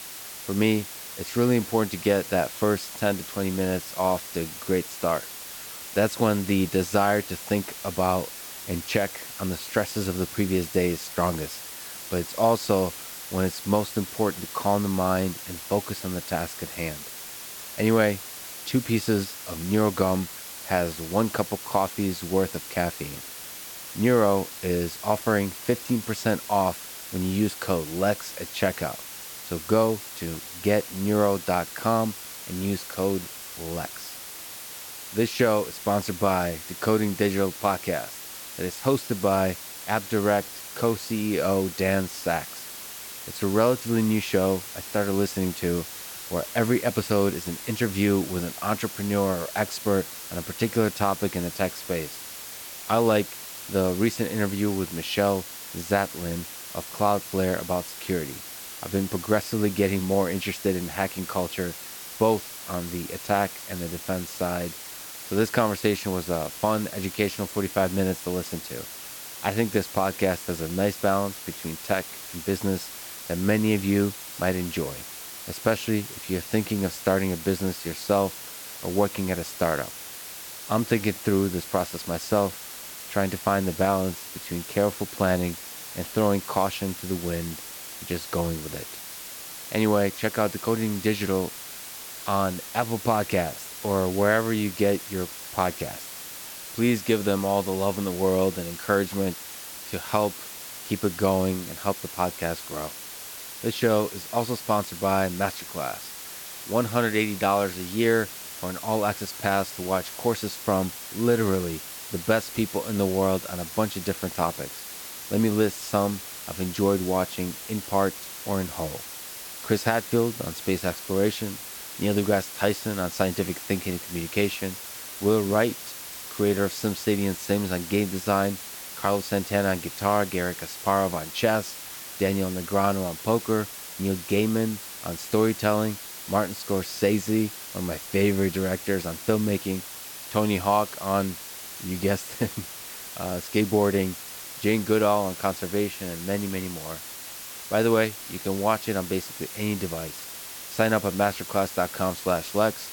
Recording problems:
hiss; loud; throughout; 10 dB below the speech

